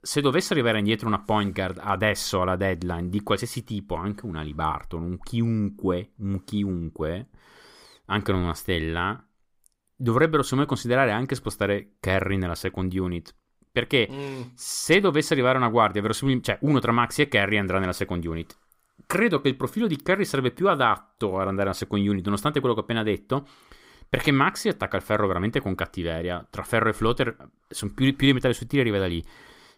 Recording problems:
none

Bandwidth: 15.5 kHz